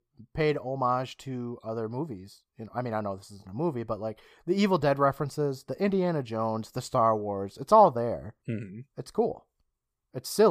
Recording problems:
abrupt cut into speech; at the end

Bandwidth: 15 kHz